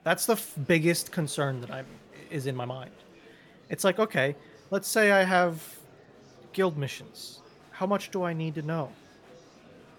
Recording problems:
murmuring crowd; faint; throughout; 25 dB below the speech

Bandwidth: 17.5 kHz